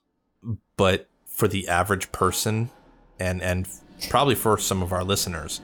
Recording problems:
household noises; faint; throughout; 25 dB below the speech

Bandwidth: 19 kHz